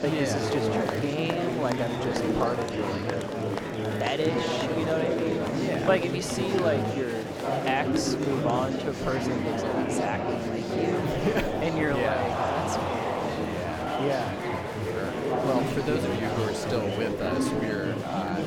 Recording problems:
murmuring crowd; very loud; throughout; 2 dB above the speech

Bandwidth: 17.5 kHz